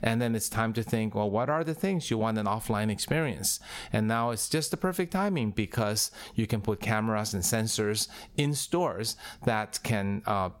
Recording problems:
squashed, flat; somewhat

